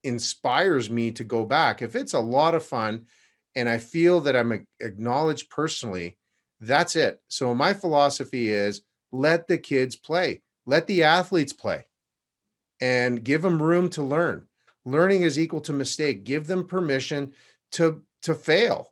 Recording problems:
none

